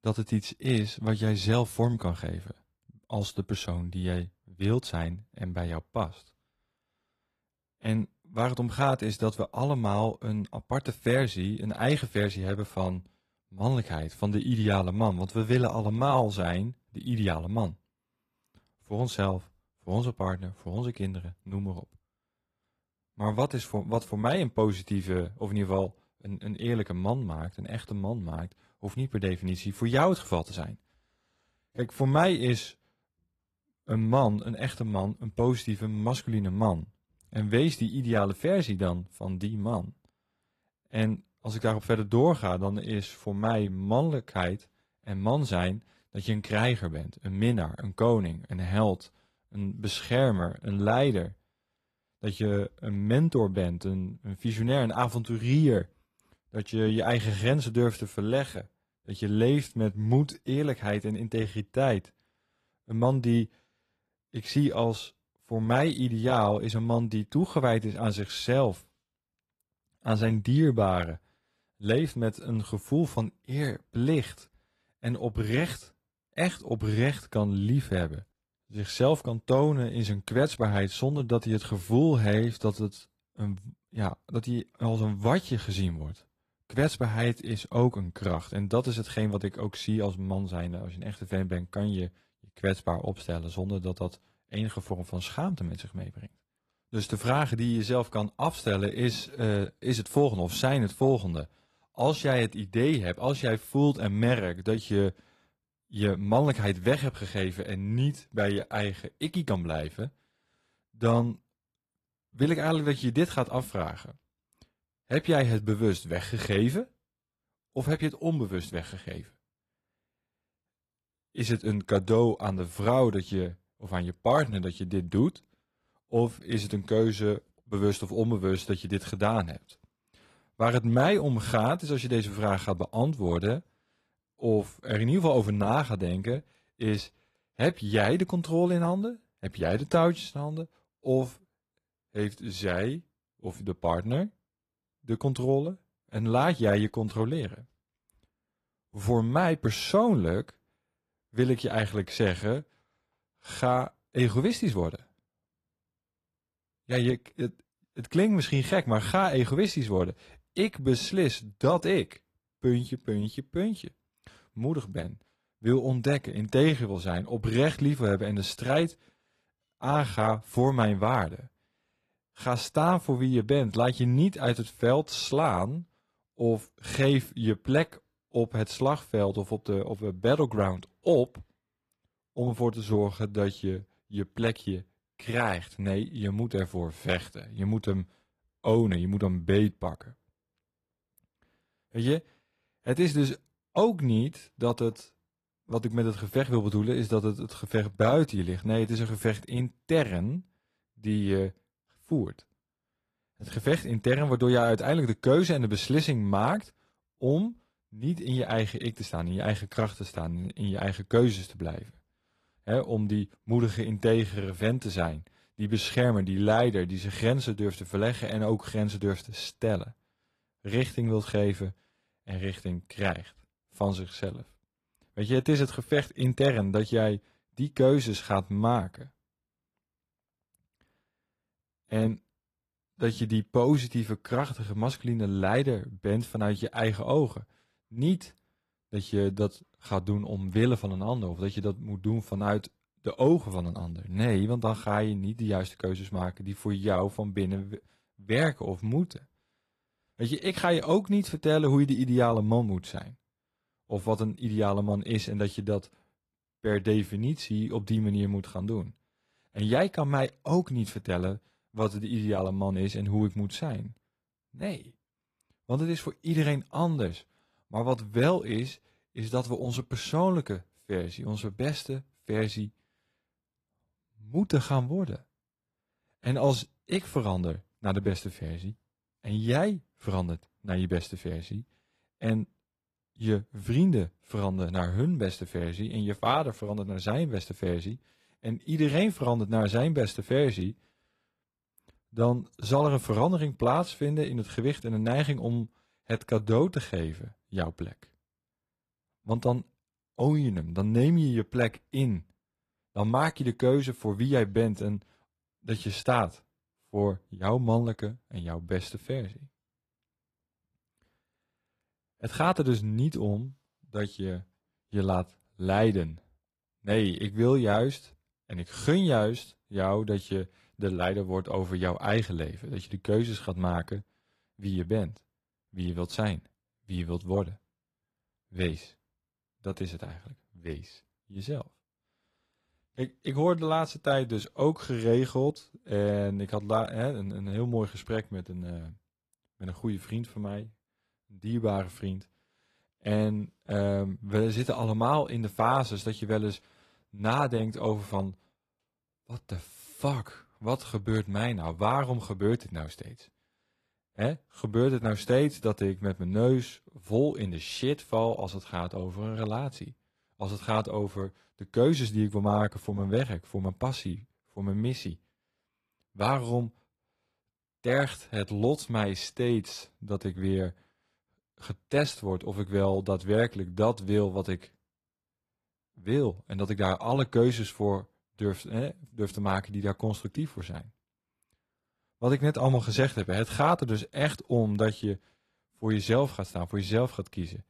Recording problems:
garbled, watery; slightly; nothing above 13 kHz

